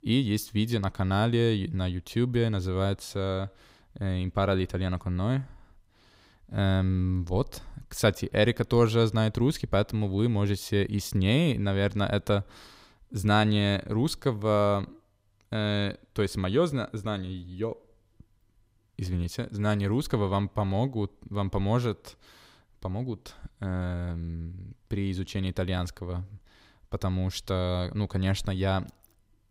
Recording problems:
none

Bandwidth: 15.5 kHz